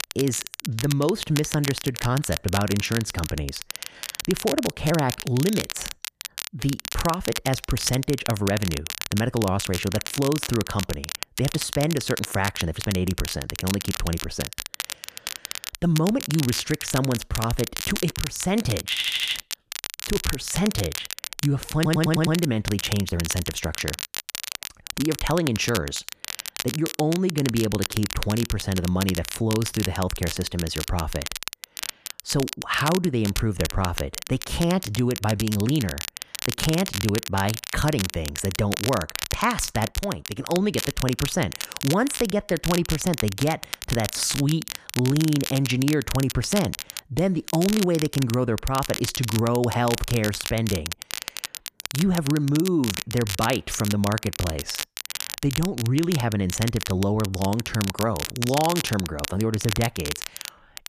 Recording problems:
crackle, like an old record; loud; 6 dB below the speech
audio stuttering; at 19 s and at 22 s

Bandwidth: 14.5 kHz